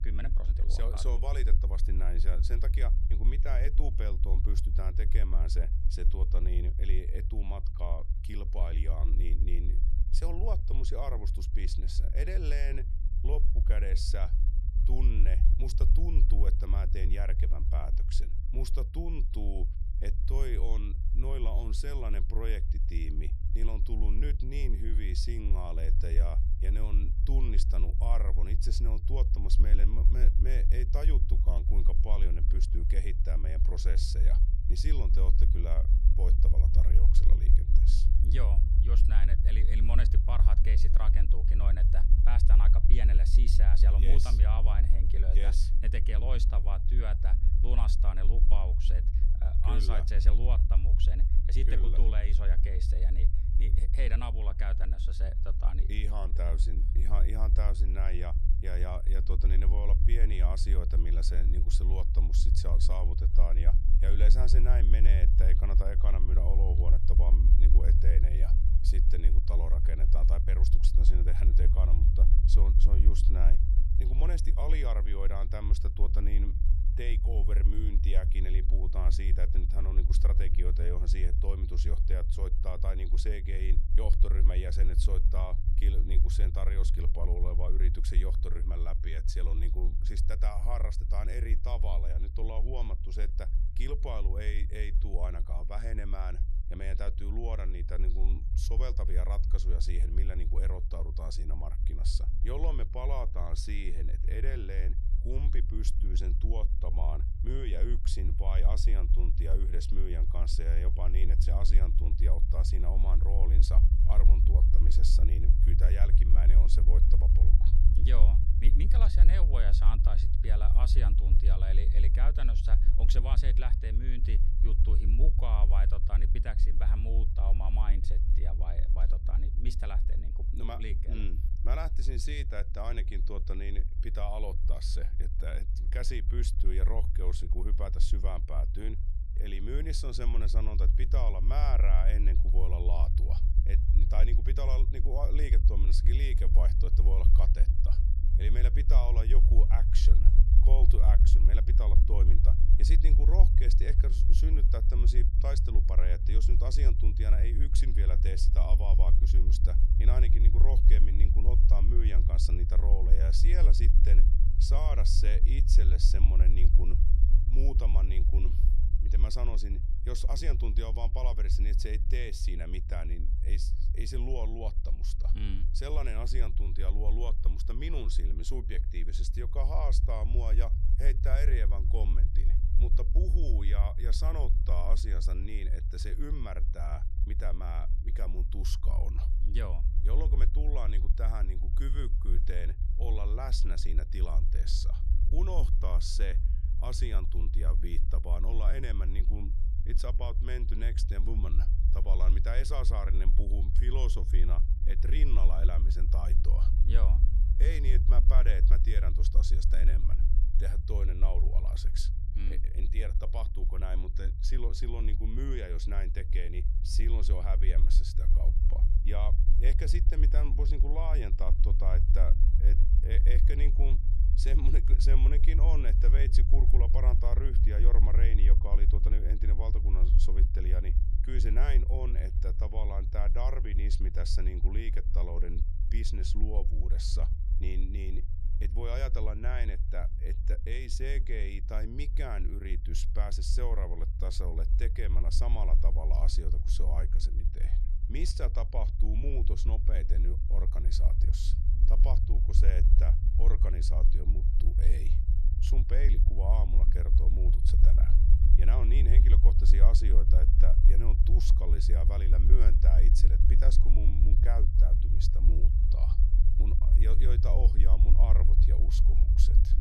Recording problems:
low rumble; loud; throughout; 6 dB below the speech

